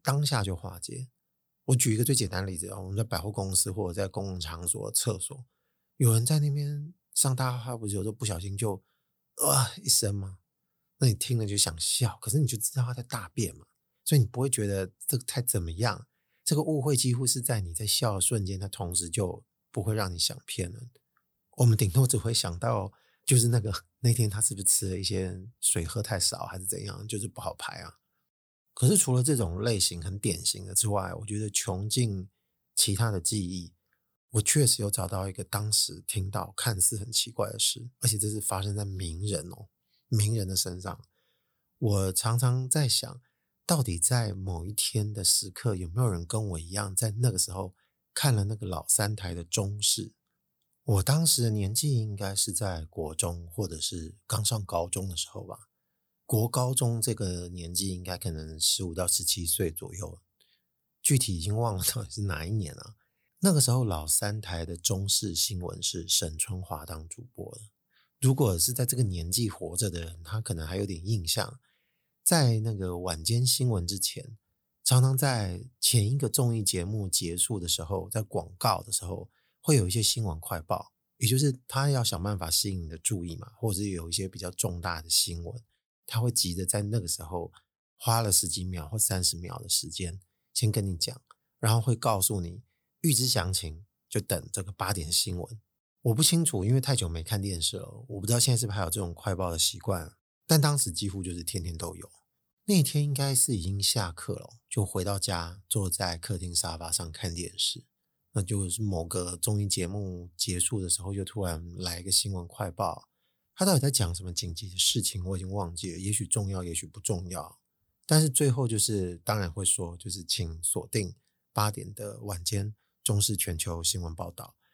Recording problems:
none

